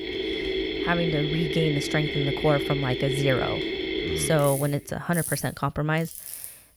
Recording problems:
machinery noise; loud; throughout; 3 dB below the speech

